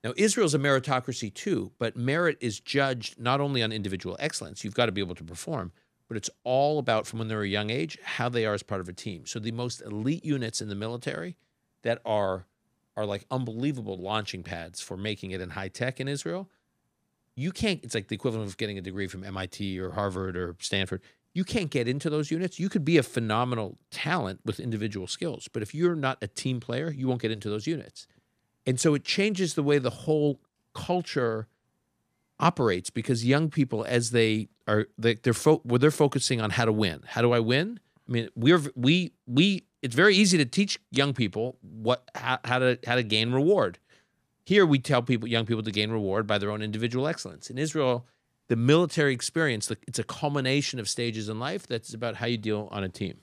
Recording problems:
none

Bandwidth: 15 kHz